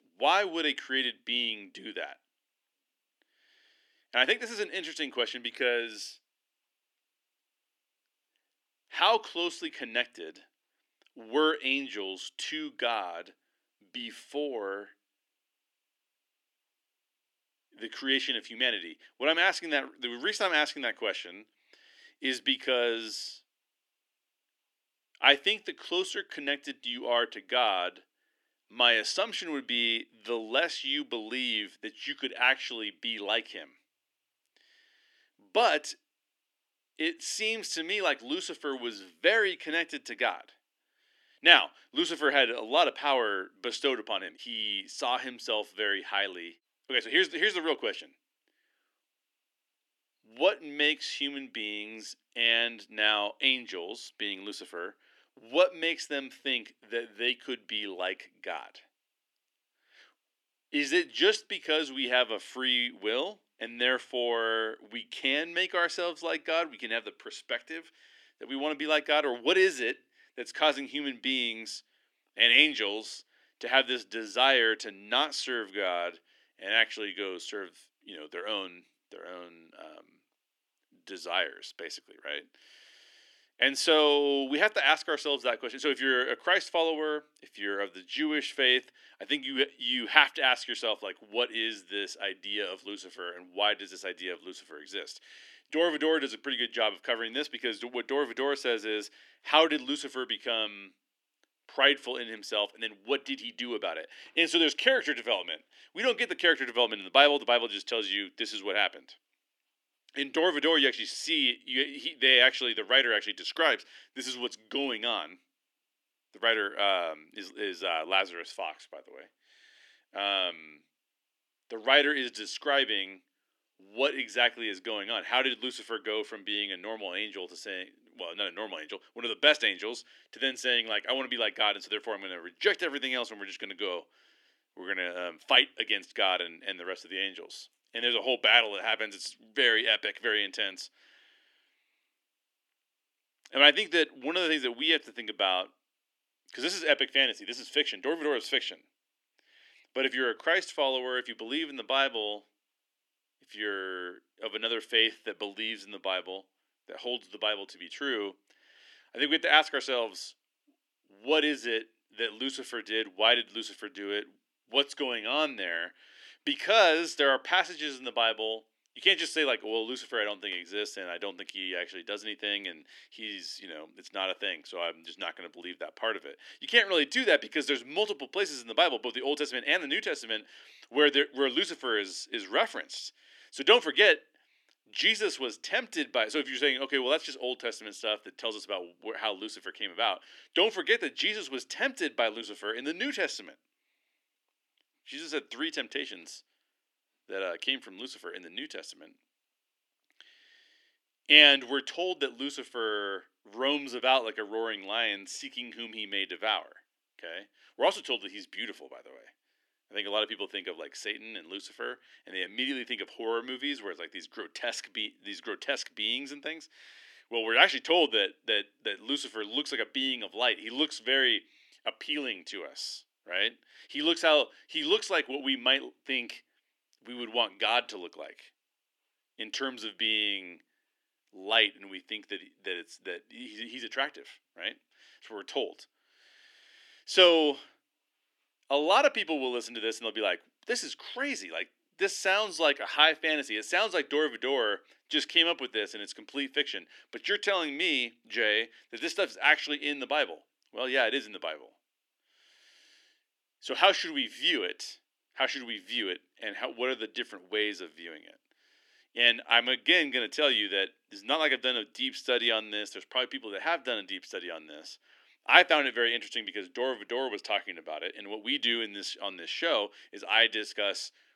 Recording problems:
thin; somewhat; fading below 300 Hz

